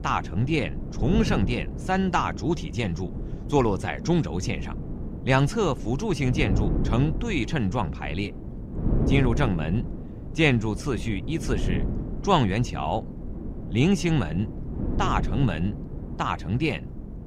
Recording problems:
wind noise on the microphone; occasional gusts; 10 dB below the speech

